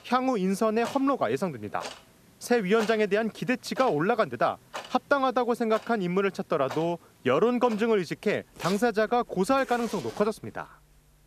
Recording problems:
household noises; noticeable; throughout; 15 dB below the speech

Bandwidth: 14 kHz